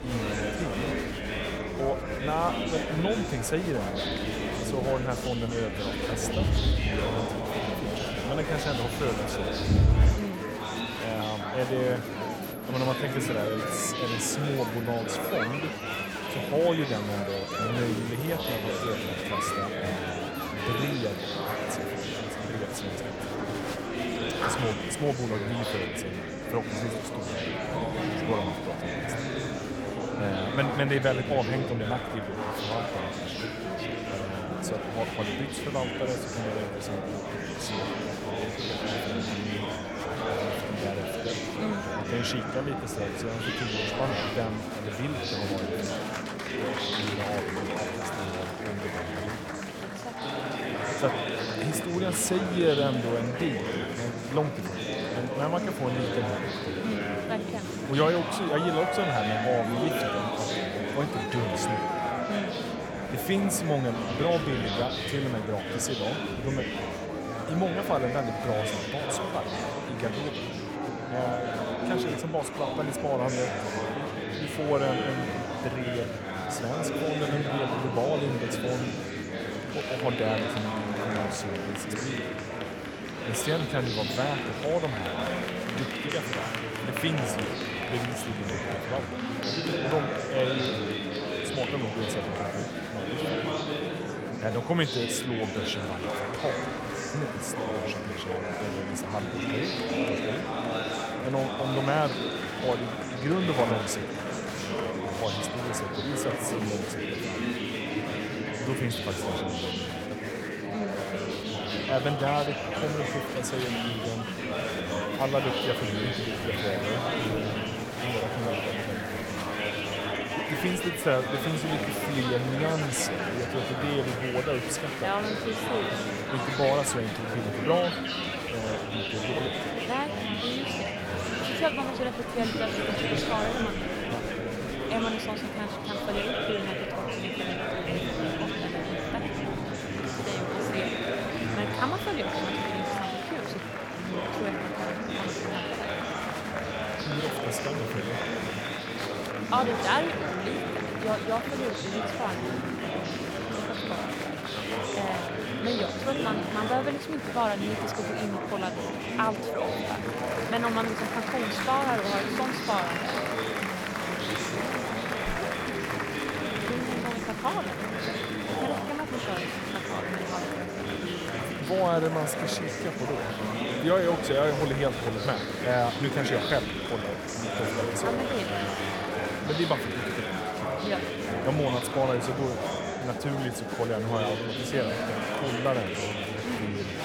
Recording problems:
murmuring crowd; very loud; throughout; 1 dB above the speech

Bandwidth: 18 kHz